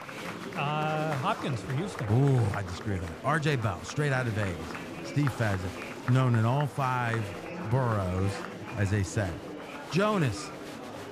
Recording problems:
murmuring crowd; loud; throughout; 9 dB below the speech

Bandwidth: 14.5 kHz